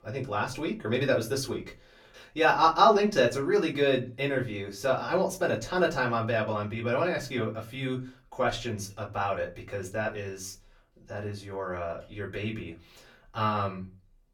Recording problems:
off-mic speech; far
room echo; very slight; dies away in 0.2 s

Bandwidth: 18 kHz